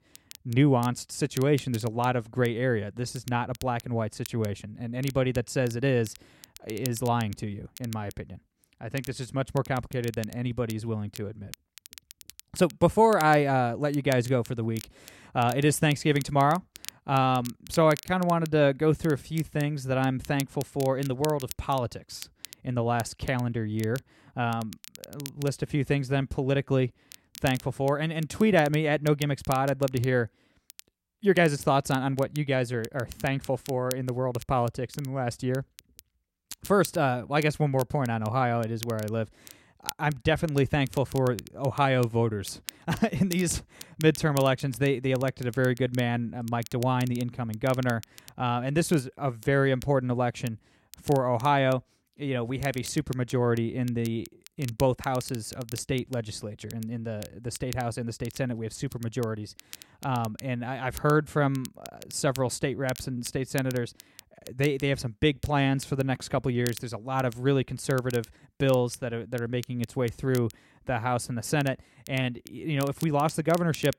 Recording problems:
crackle, like an old record; noticeable; 20 dB below the speech

